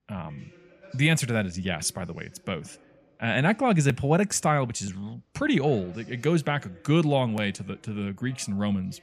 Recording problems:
voice in the background; faint; throughout; 30 dB below the speech

